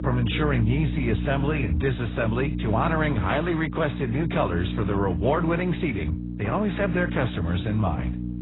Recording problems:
garbled, watery; badly; nothing above 4 kHz
electrical hum; noticeable; throughout; 60 Hz, 10 dB below the speech

